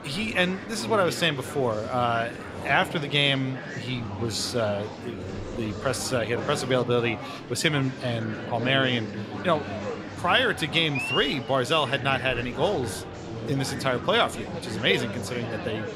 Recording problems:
murmuring crowd; loud; throughout; 9 dB below the speech

